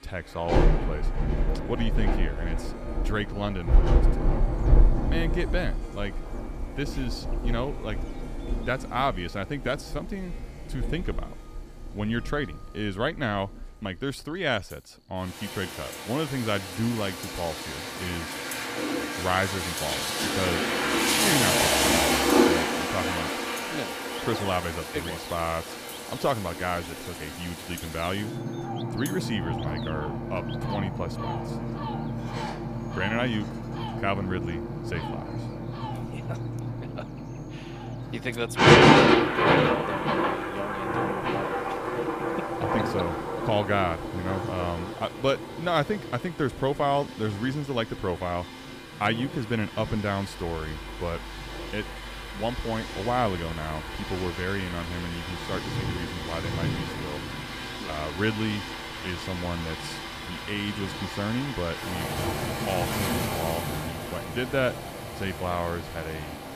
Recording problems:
rain or running water; very loud; throughout; 3 dB above the speech
animal sounds; noticeable; throughout; 20 dB below the speech
background music; noticeable; throughout; 20 dB below the speech
electrical hum; faint; throughout; 50 Hz, 25 dB below the speech

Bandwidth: 15 kHz